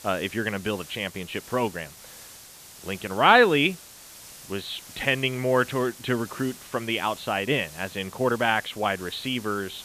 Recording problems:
high frequencies cut off; severe; nothing above 4.5 kHz
hiss; noticeable; throughout; 20 dB below the speech

